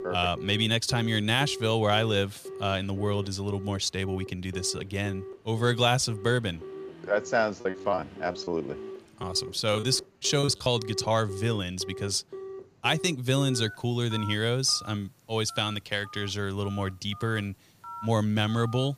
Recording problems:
alarms or sirens; noticeable; throughout; 15 dB below the speech
traffic noise; faint; throughout; 25 dB below the speech
choppy; very; from 7.5 to 11 s; 17% of the speech affected

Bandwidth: 15 kHz